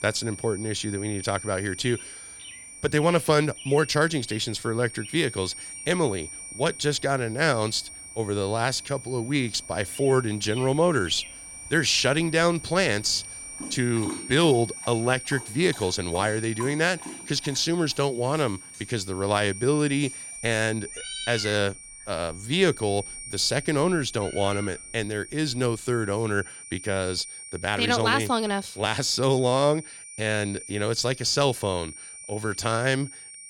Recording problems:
high-pitched whine; noticeable; throughout; 9 kHz, 15 dB below the speech
animal sounds; noticeable; until 26 s; 15 dB below the speech

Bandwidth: 17 kHz